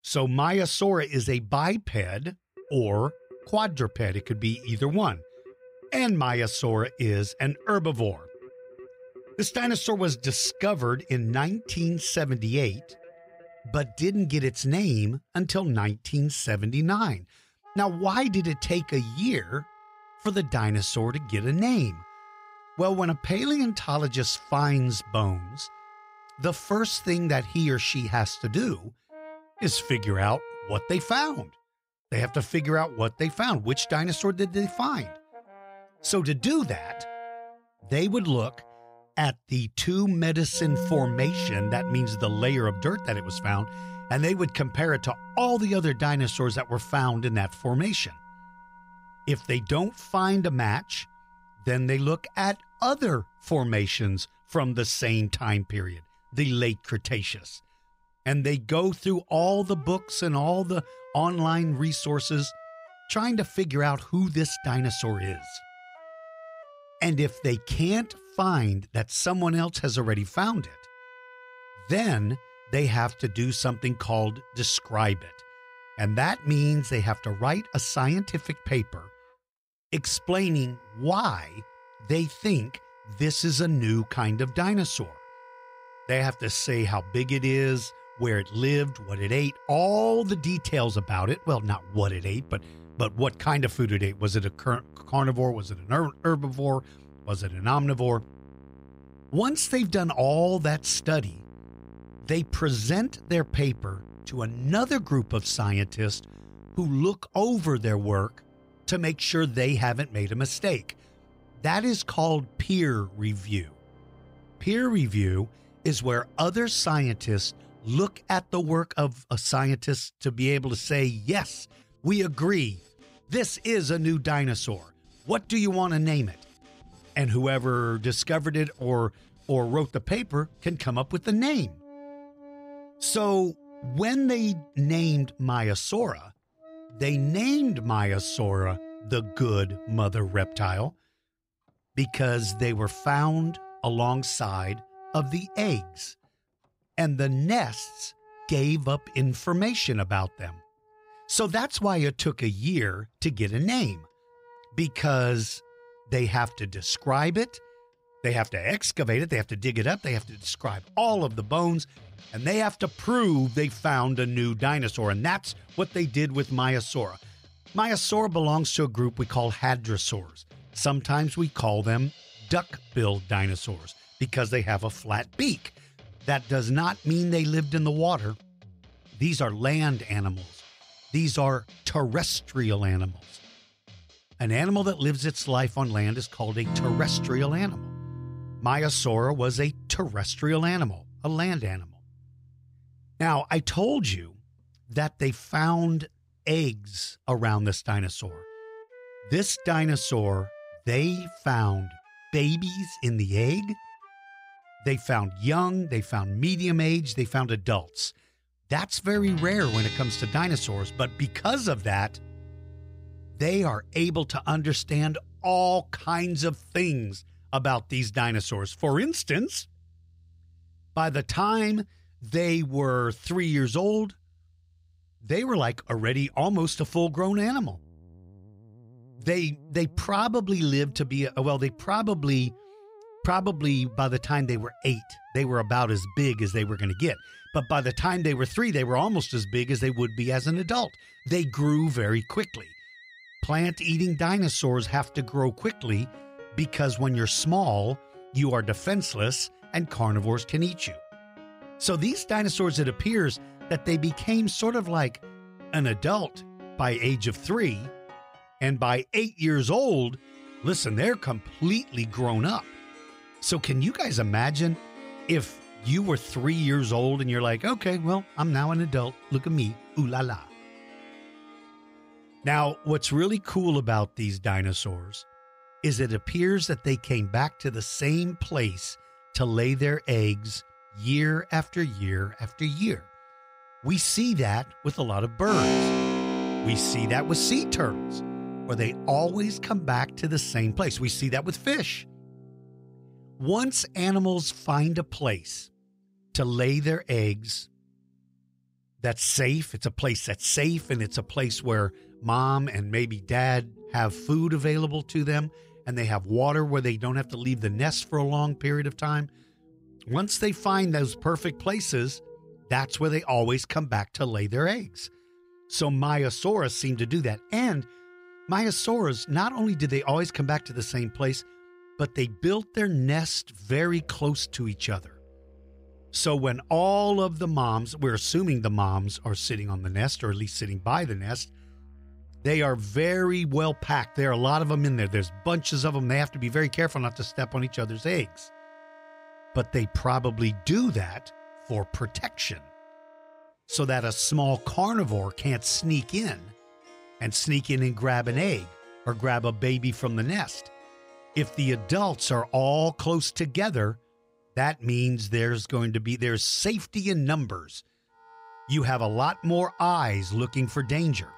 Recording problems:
background music; noticeable; throughout; 15 dB below the speech

